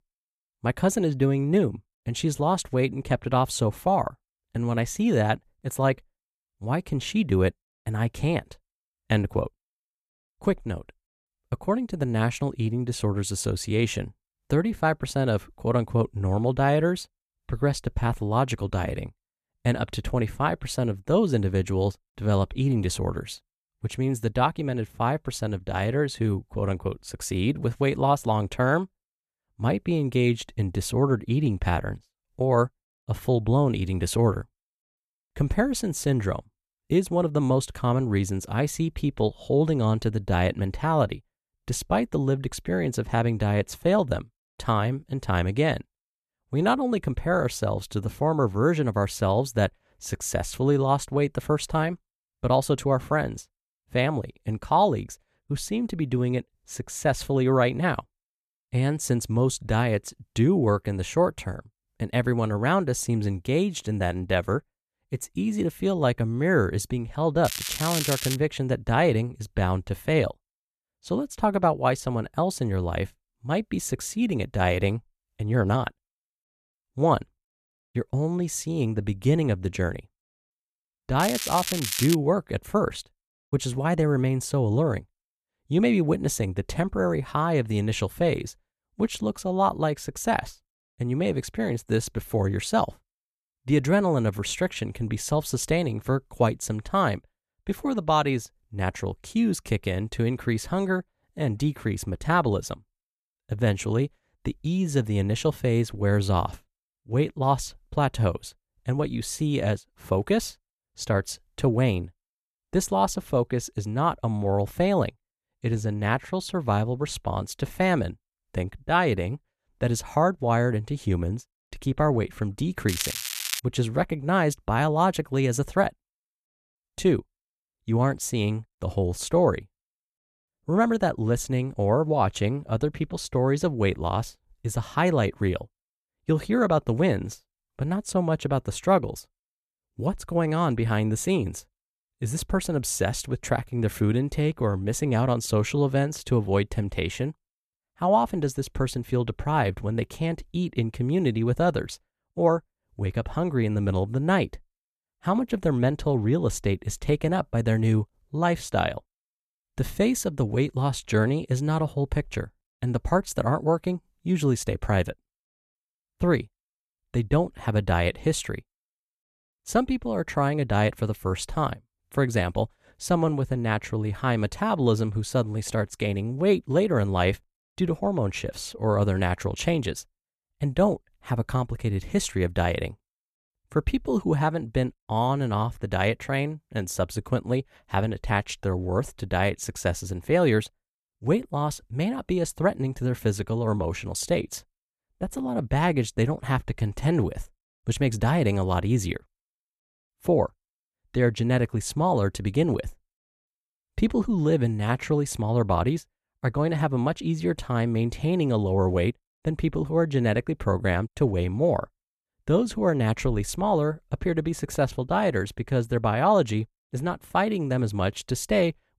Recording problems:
crackling; loud; at 1:07, at 1:21 and at 2:03; 4 dB below the speech

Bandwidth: 14 kHz